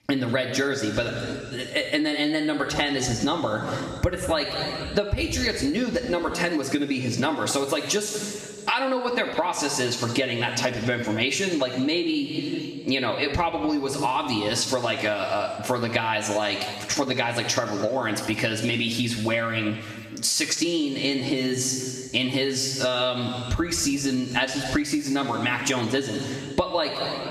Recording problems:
room echo; noticeable; dies away in 1.4 s
off-mic speech; somewhat distant
squashed, flat; somewhat

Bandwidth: 14 kHz